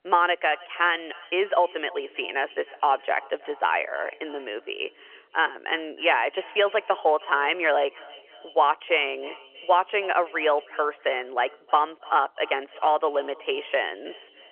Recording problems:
echo of what is said; faint; throughout; 310 ms later, 20 dB below the speech
phone-call audio; nothing above 3 kHz

